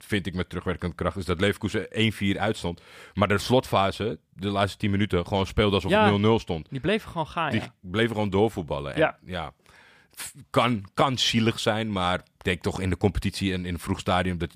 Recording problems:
none

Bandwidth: 15 kHz